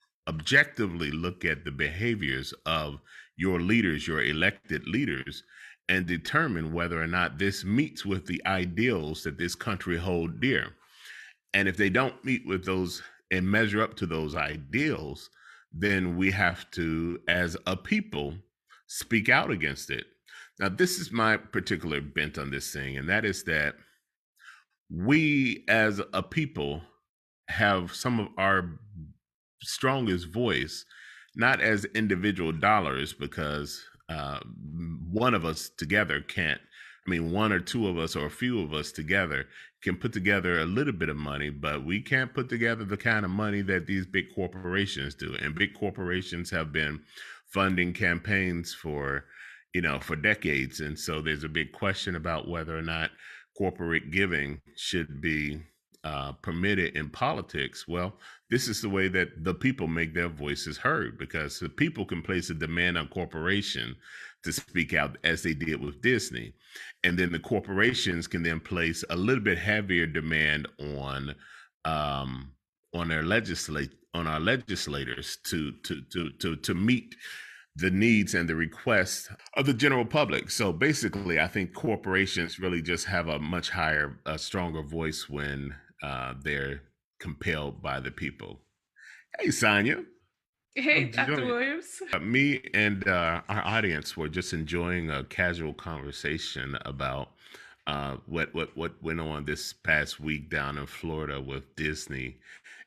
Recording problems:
none

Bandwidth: 13.5 kHz